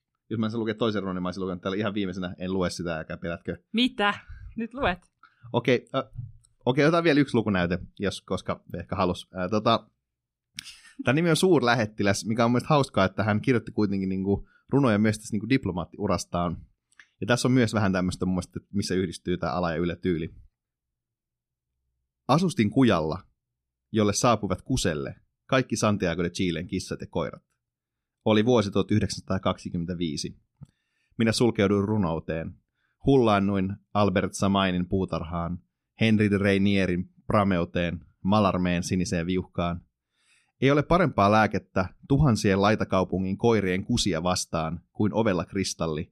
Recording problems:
none

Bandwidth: 14.5 kHz